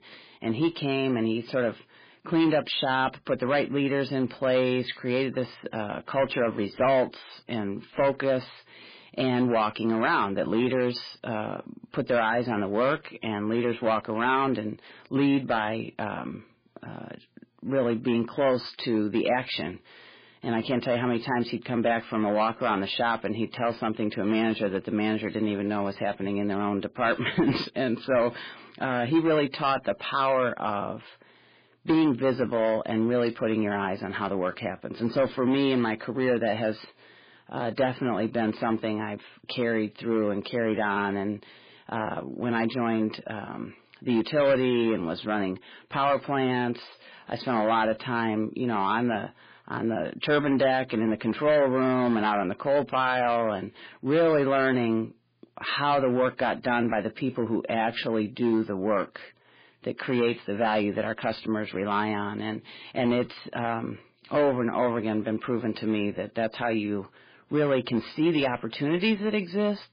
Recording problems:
garbled, watery; badly; nothing above 5 kHz
distortion; slight; 5% of the sound clipped

